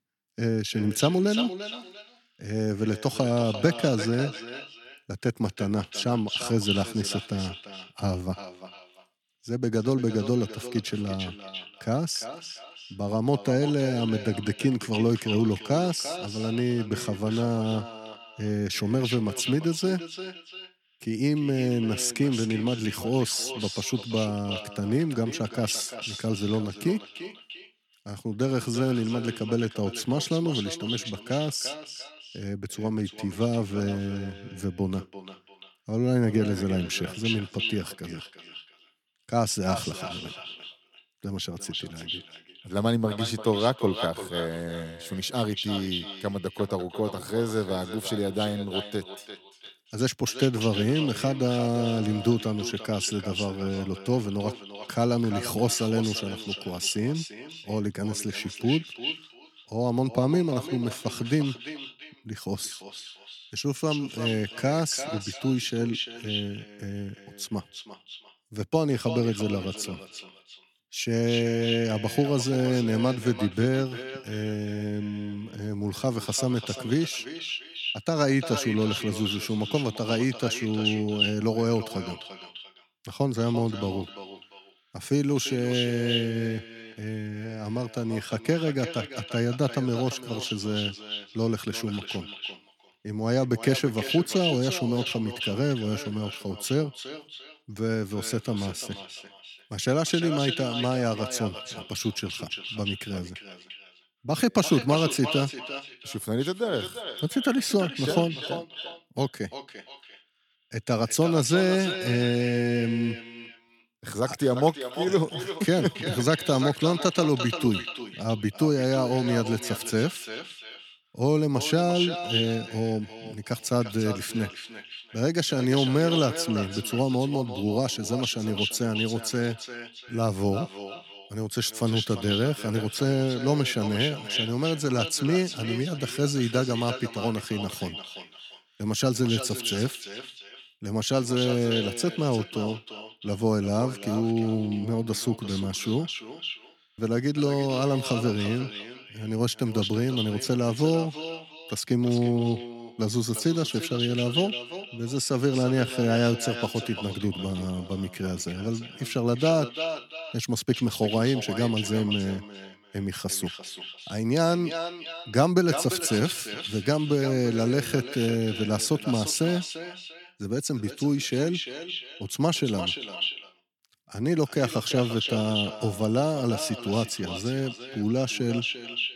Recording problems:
echo of what is said; strong; throughout; 350 ms later, 8 dB below the speech

